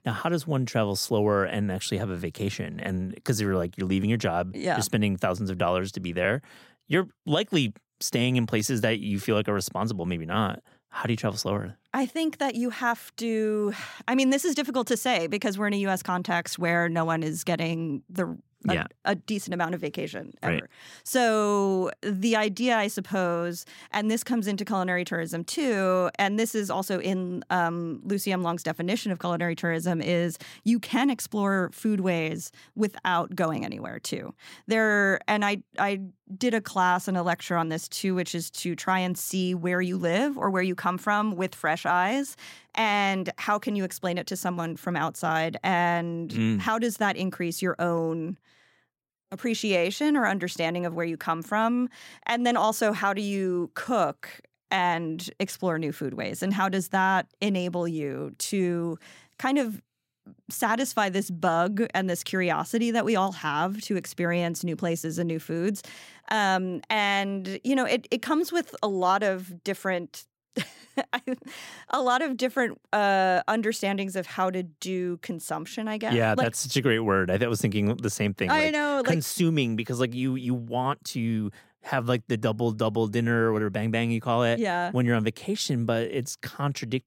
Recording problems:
none

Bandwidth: 16 kHz